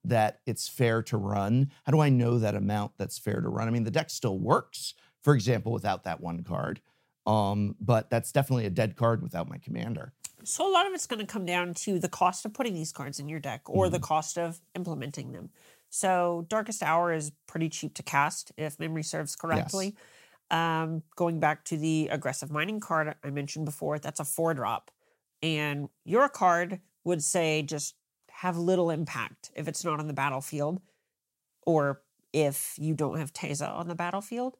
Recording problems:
none

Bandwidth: 16 kHz